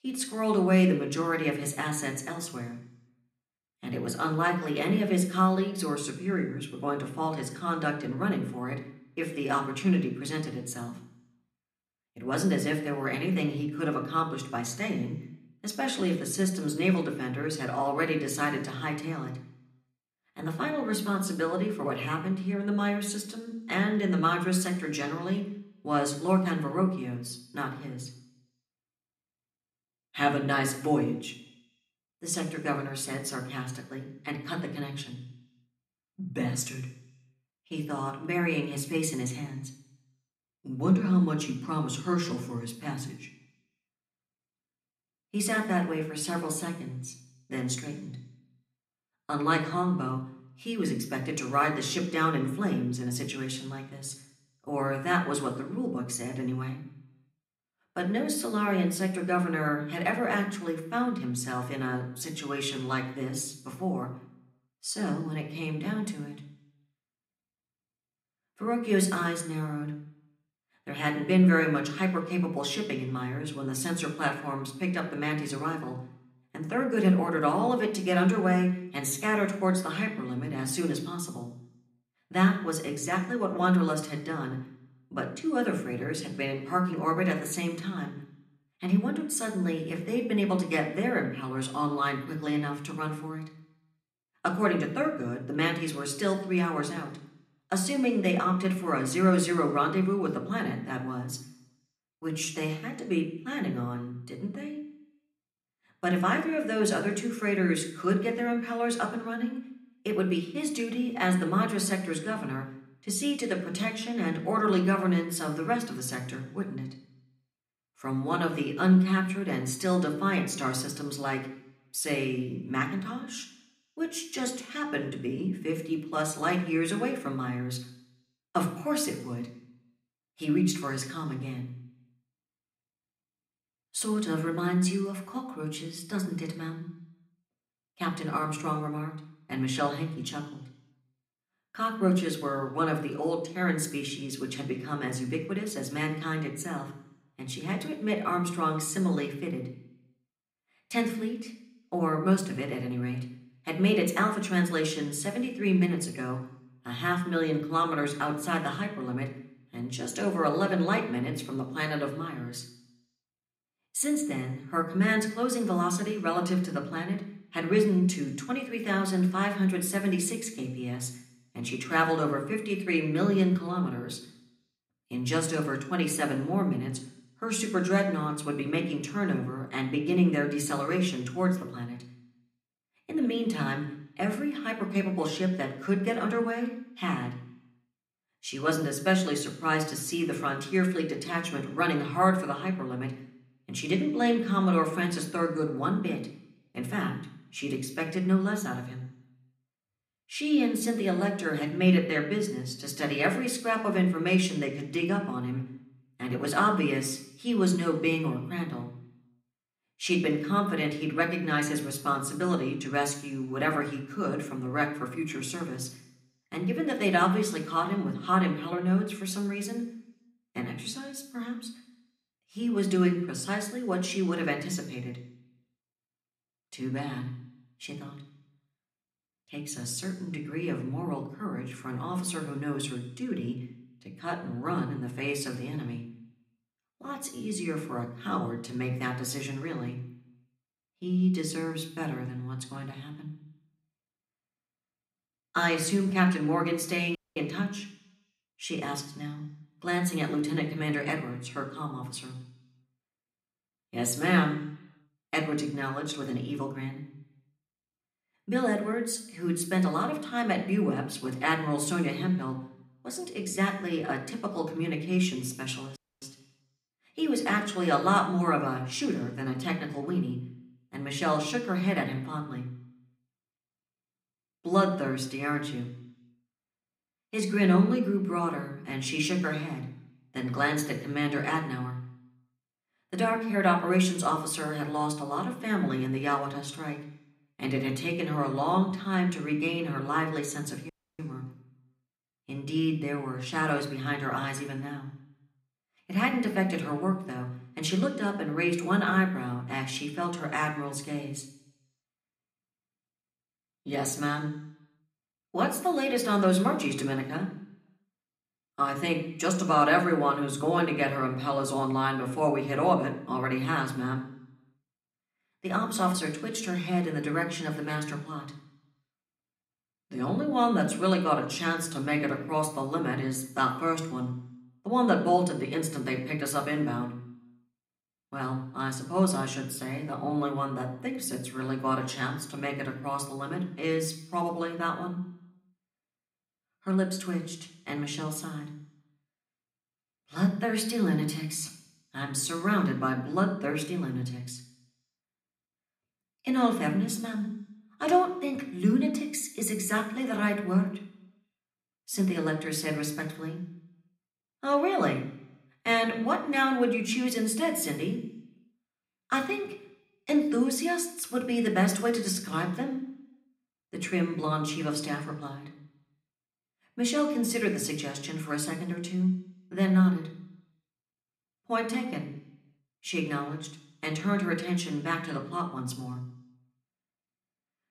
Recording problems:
room echo; slight; dies away in 0.8 s
off-mic speech; somewhat distant
audio cutting out; at 4:07, at 4:26 and at 4:51

